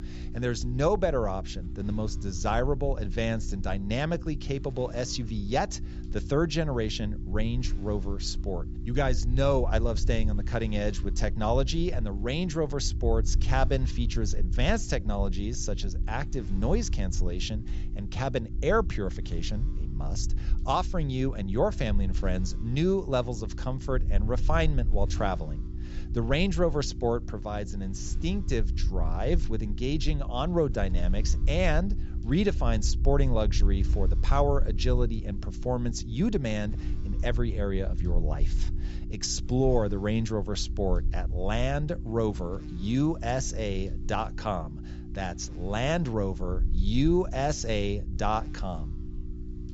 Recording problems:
high frequencies cut off; noticeable; nothing above 8 kHz
electrical hum; noticeable; throughout; 60 Hz, 20 dB below the speech
low rumble; faint; throughout; 20 dB below the speech

